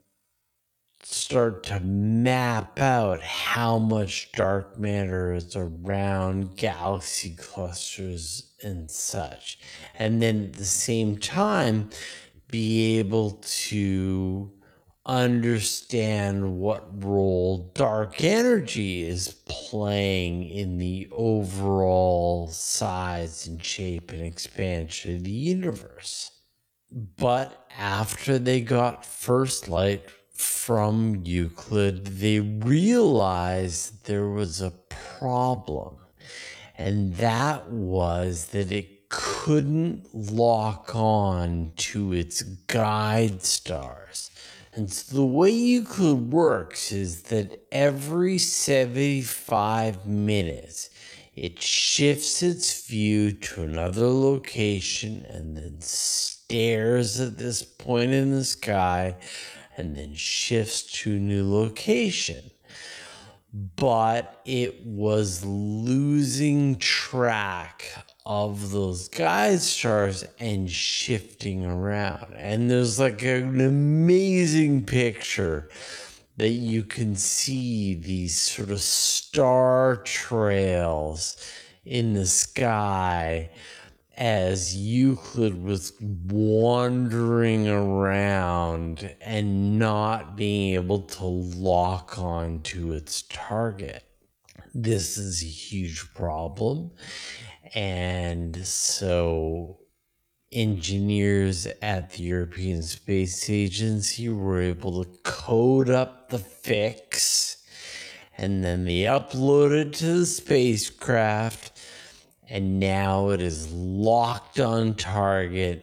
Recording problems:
wrong speed, natural pitch; too slow; 0.5 times normal speed

